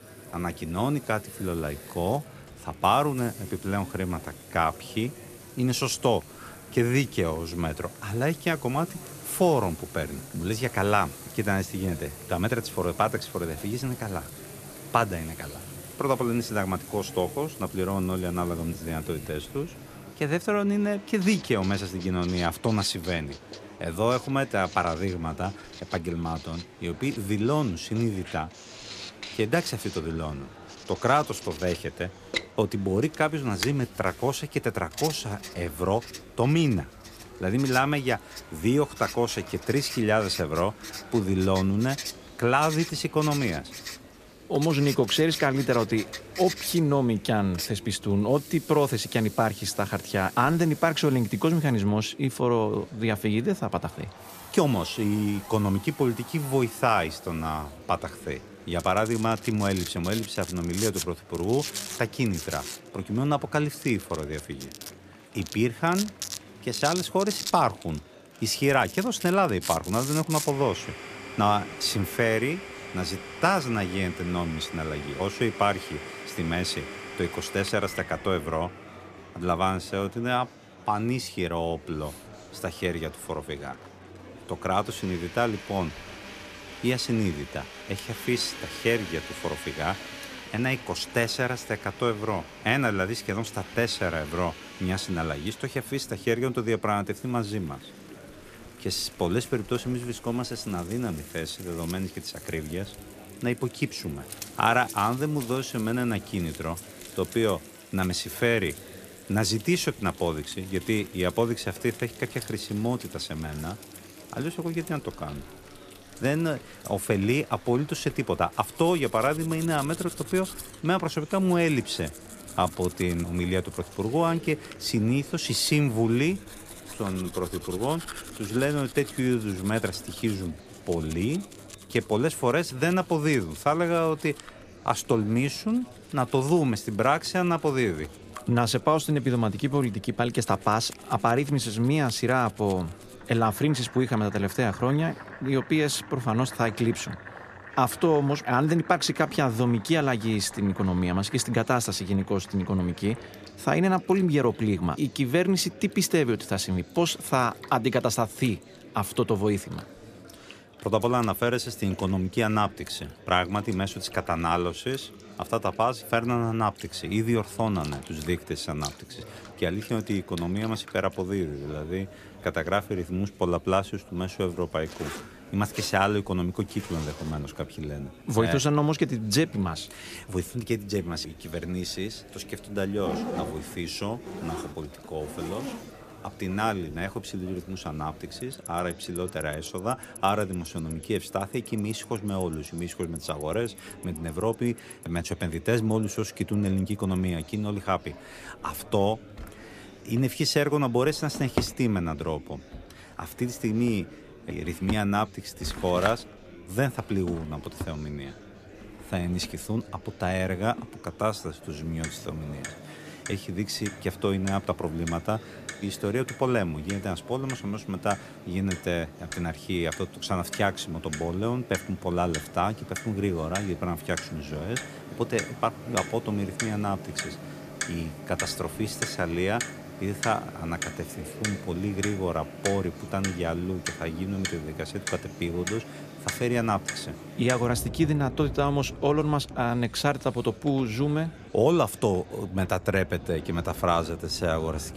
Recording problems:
household noises; noticeable; throughout; 15 dB below the speech
murmuring crowd; noticeable; throughout; 20 dB below the speech

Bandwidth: 14.5 kHz